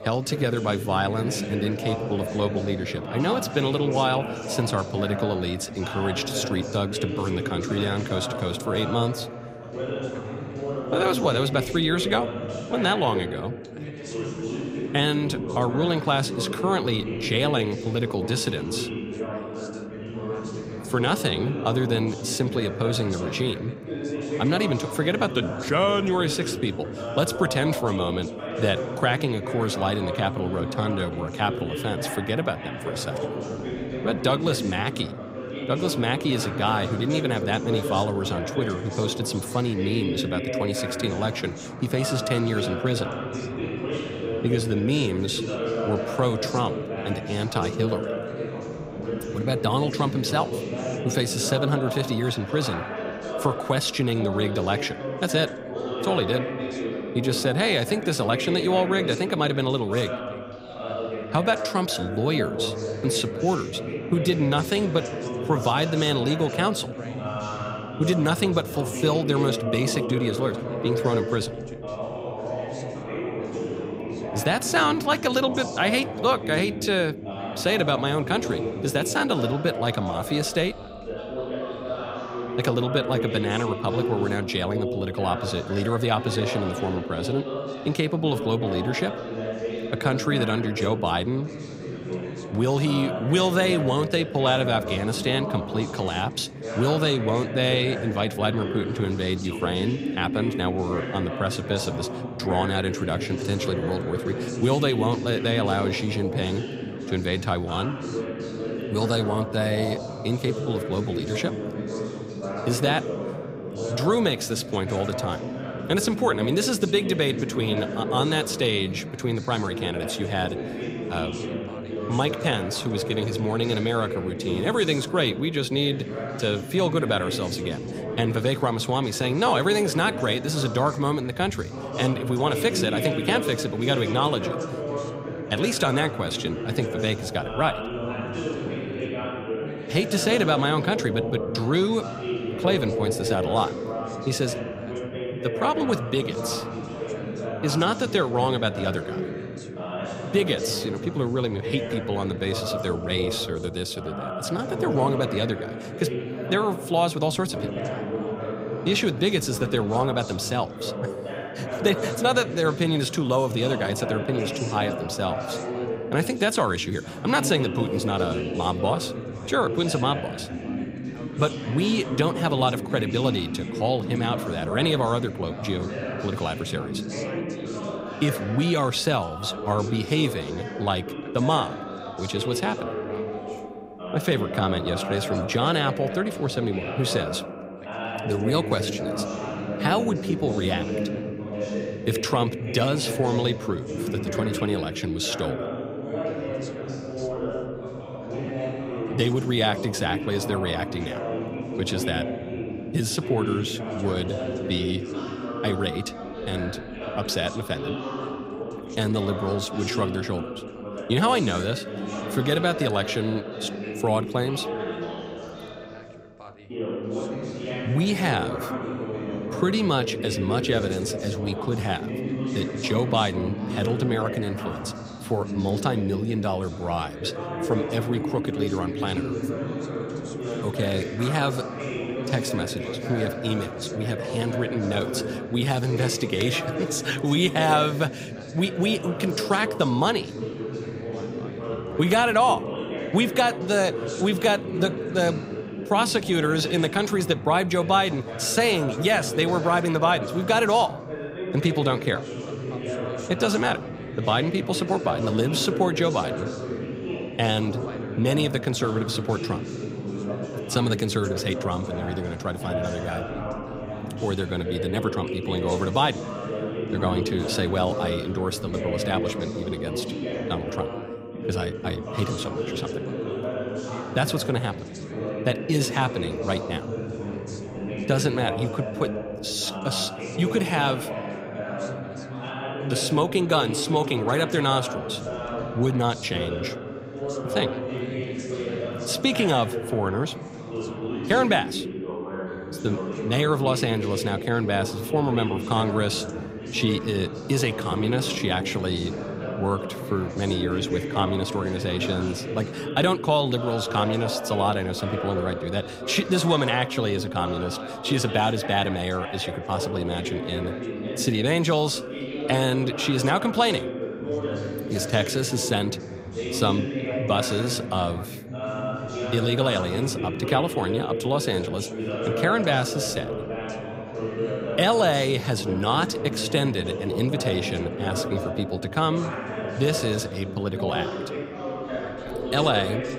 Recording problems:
background chatter; loud; throughout; 3 voices, 6 dB below the speech

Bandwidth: 15.5 kHz